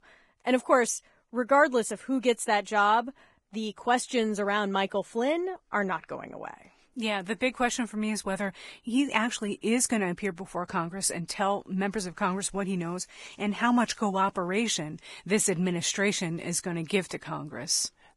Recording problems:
garbled, watery; badly; nothing above 11 kHz

